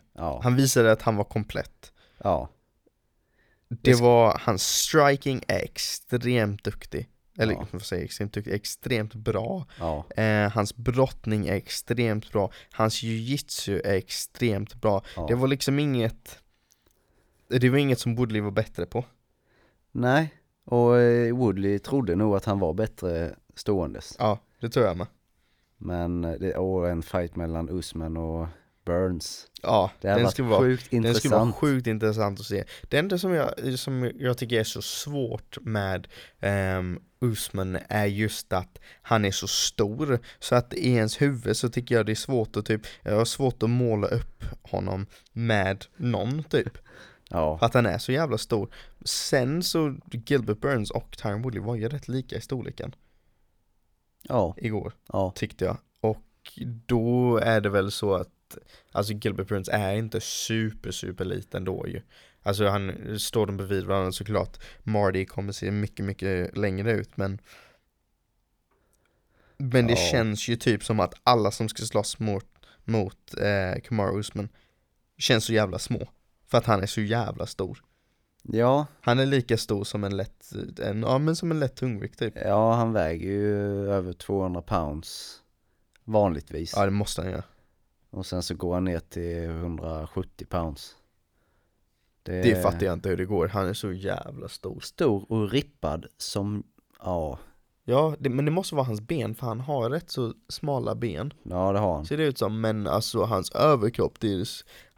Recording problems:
none

